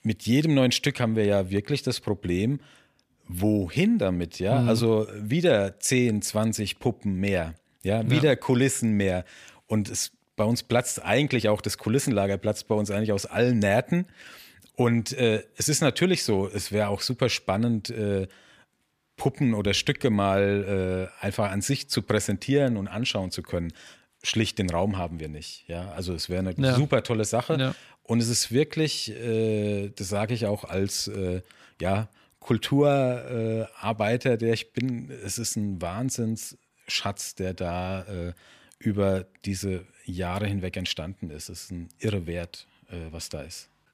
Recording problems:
none

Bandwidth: 14.5 kHz